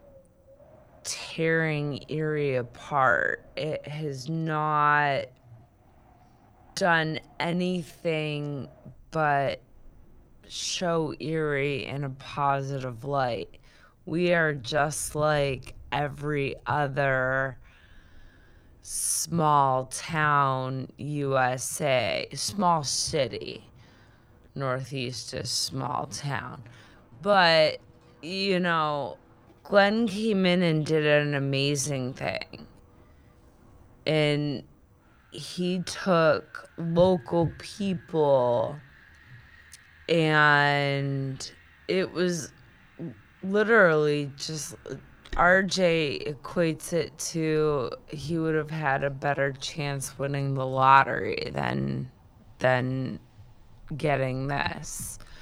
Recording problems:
wrong speed, natural pitch; too slow; 0.6 times normal speed
wind in the background; faint; throughout; 30 dB below the speech

